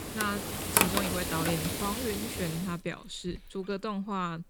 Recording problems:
household noises; very loud; throughout; 4 dB above the speech

